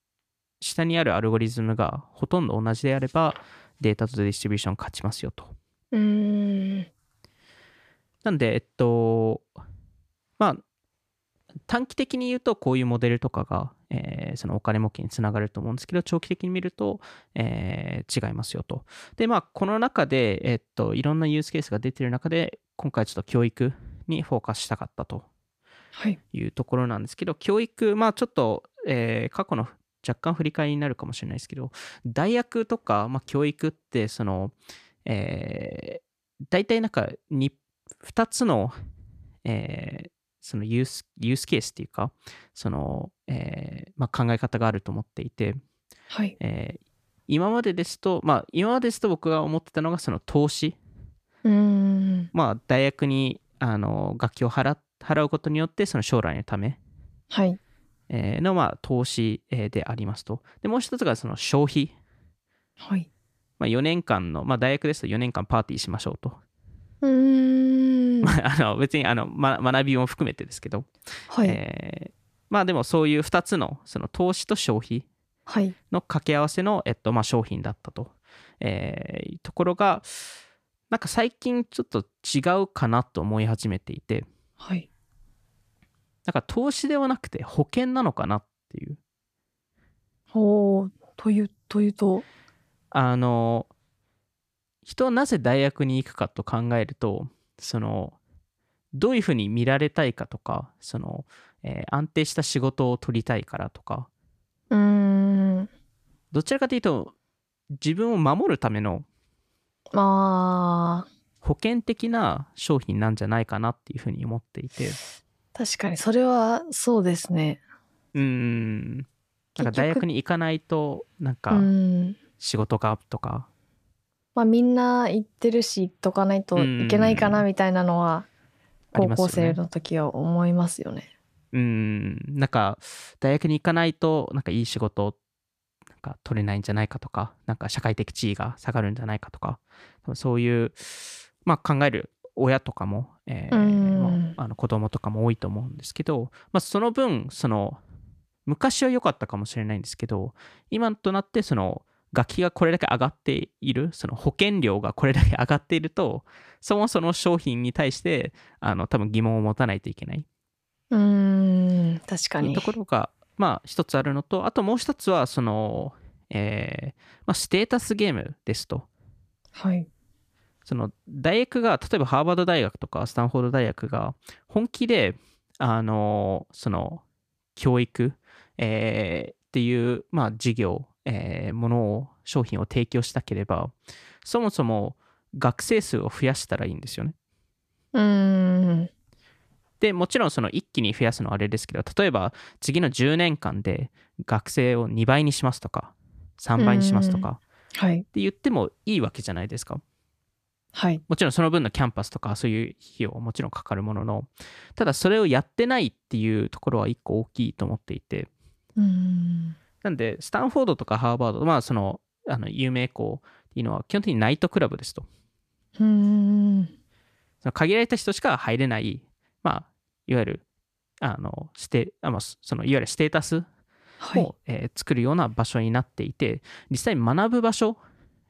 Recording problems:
none

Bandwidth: 14.5 kHz